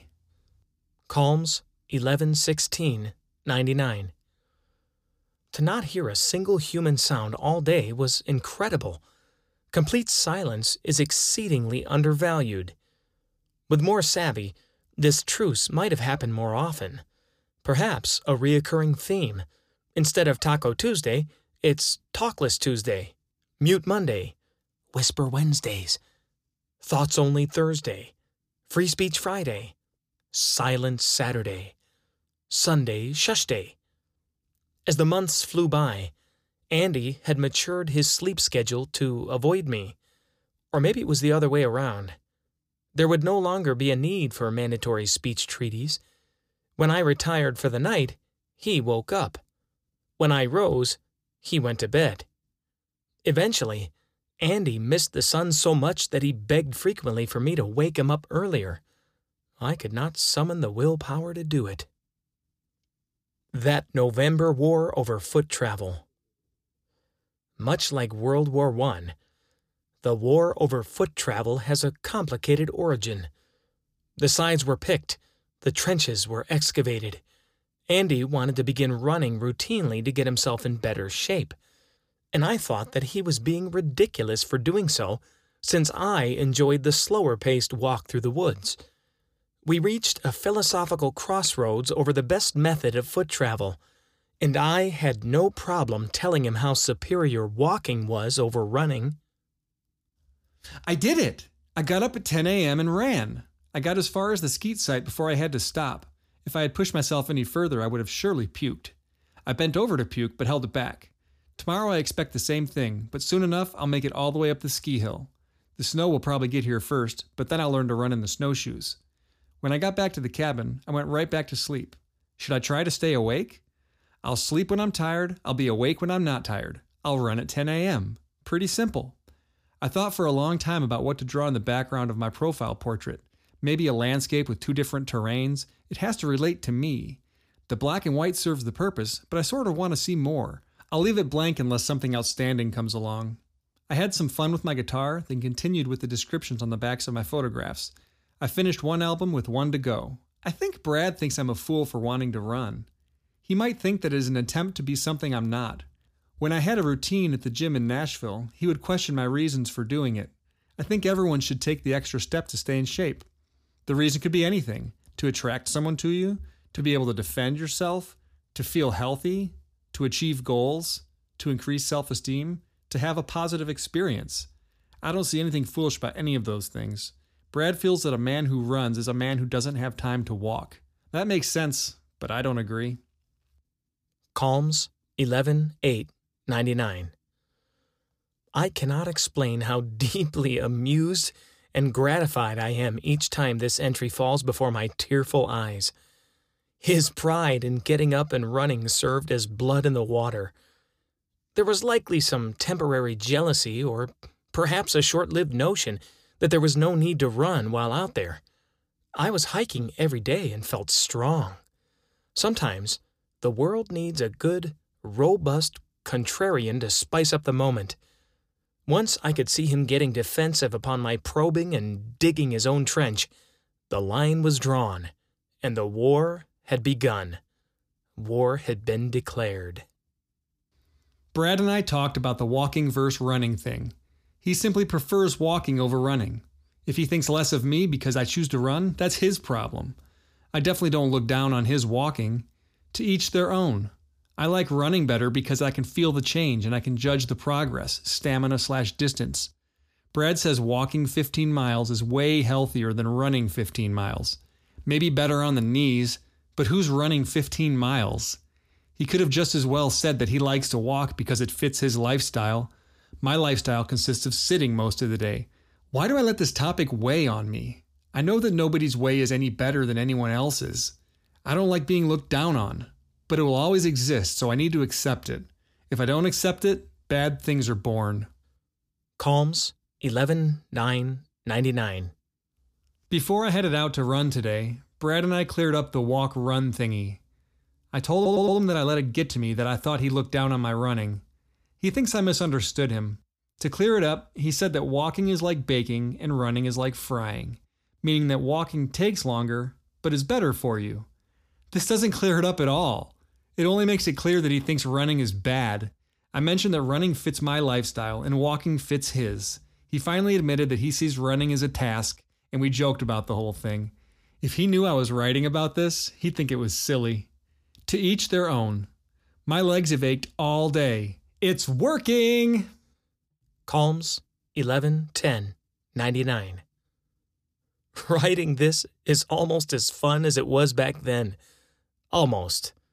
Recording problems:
audio stuttering; at 4:48

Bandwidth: 15 kHz